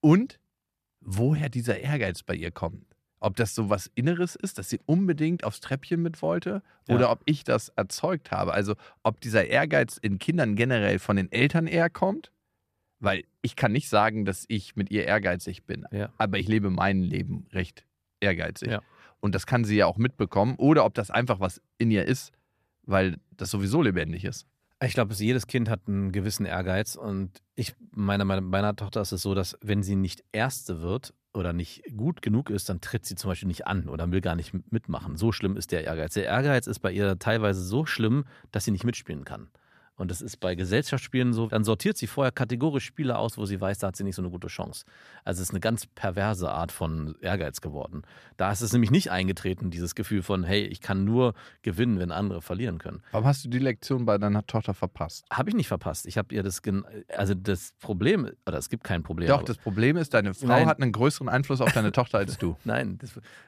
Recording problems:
none

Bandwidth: 14.5 kHz